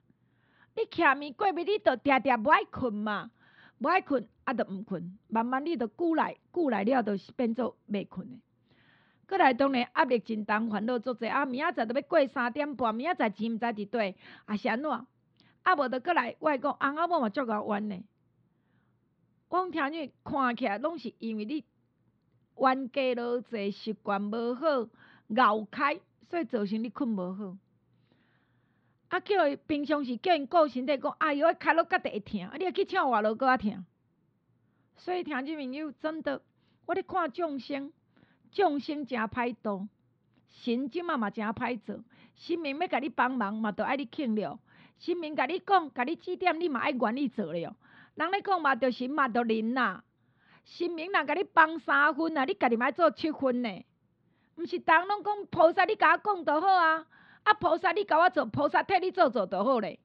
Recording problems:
muffled; very slightly; fading above 4 kHz

